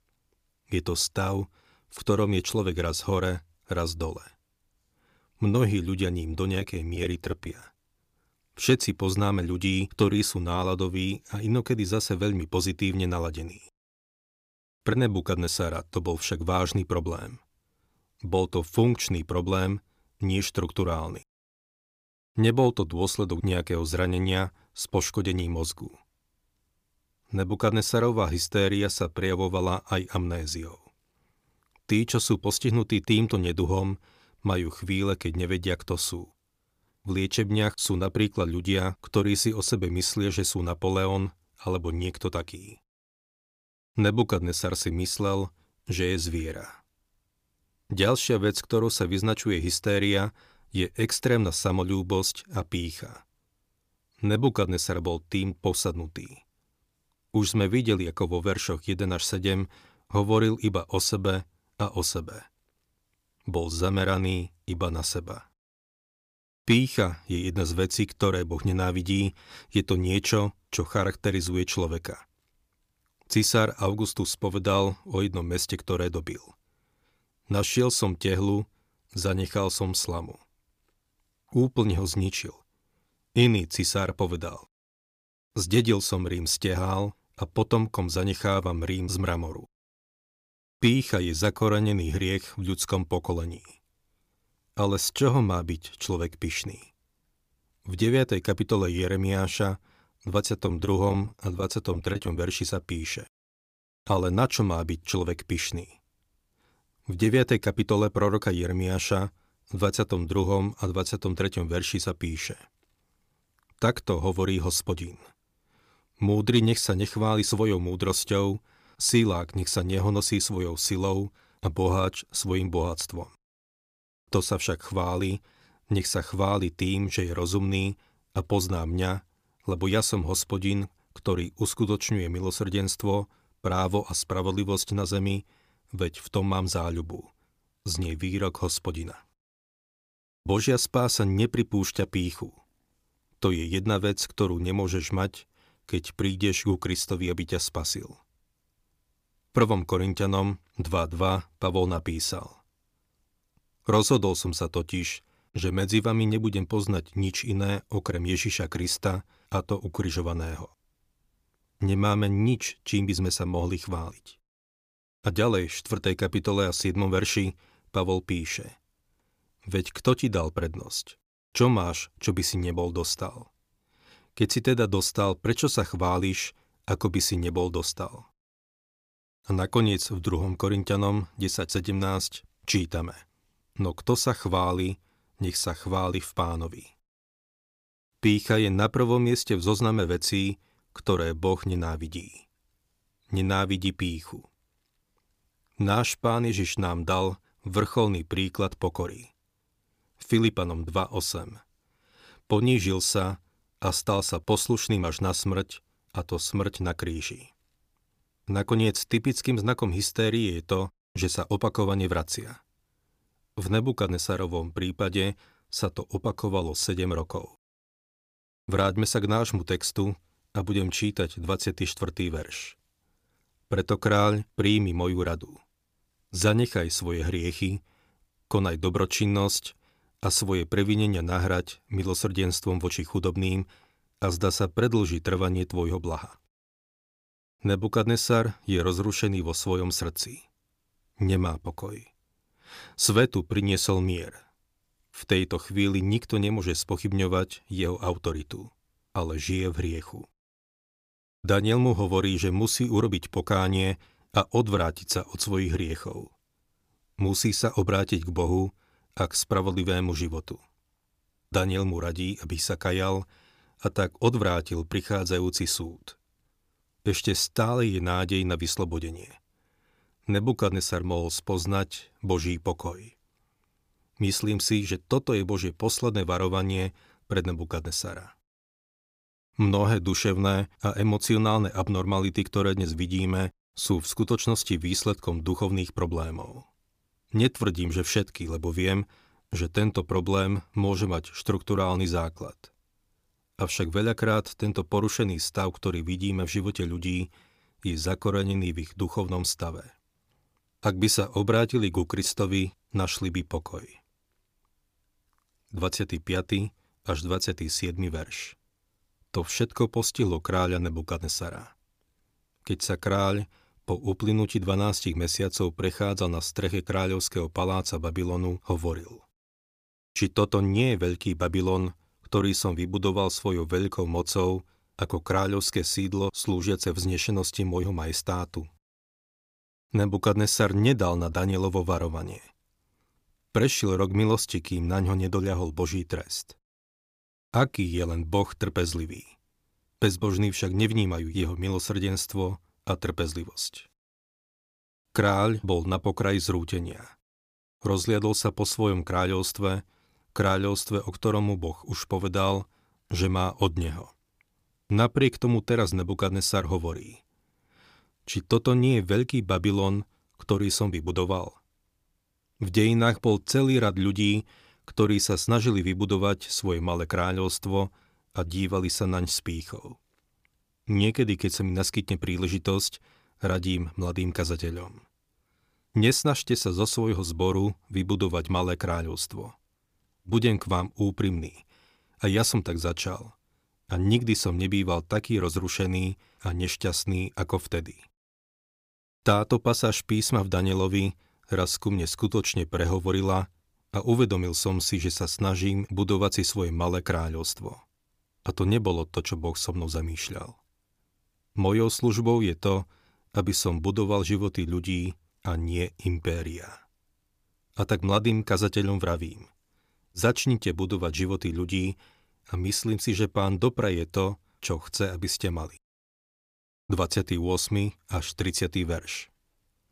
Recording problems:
choppy; very; at 6.5 s and from 1:40 to 1:42; 11% of the speech affected

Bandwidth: 15 kHz